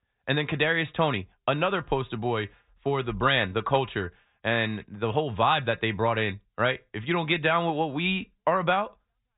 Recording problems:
high frequencies cut off; severe; nothing above 4 kHz

